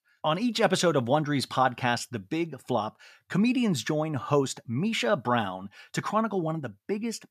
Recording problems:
none

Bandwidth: 14.5 kHz